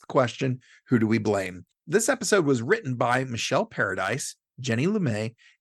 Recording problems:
none

